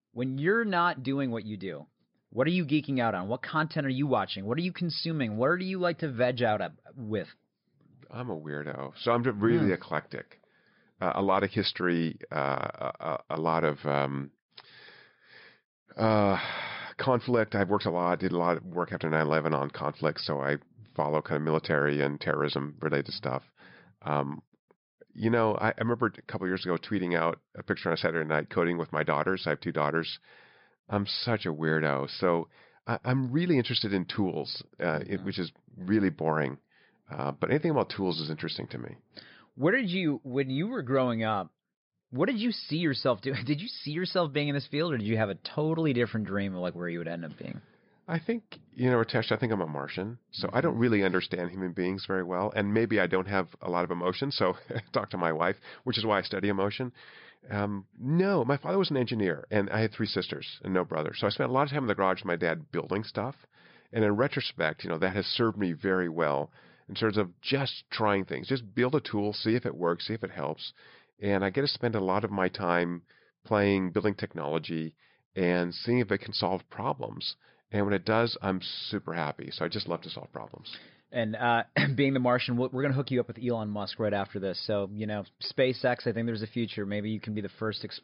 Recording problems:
high frequencies cut off; noticeable; nothing above 5.5 kHz

